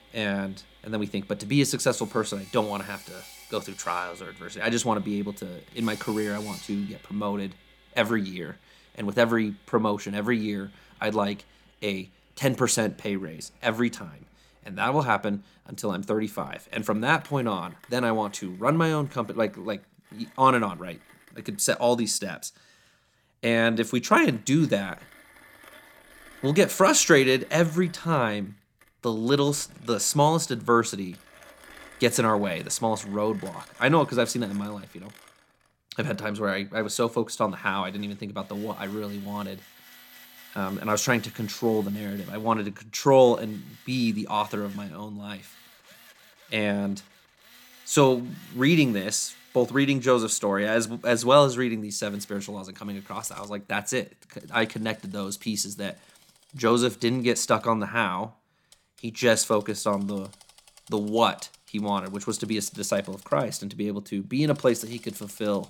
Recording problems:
machinery noise; faint; throughout; 25 dB below the speech

